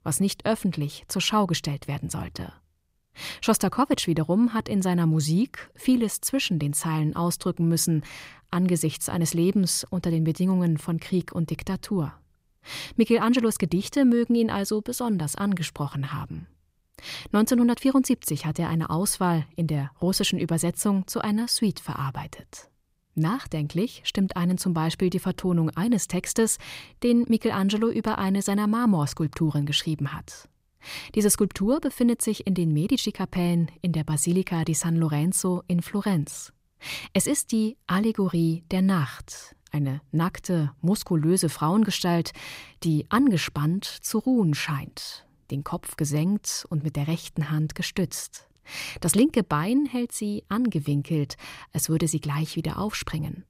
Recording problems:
none

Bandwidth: 15.5 kHz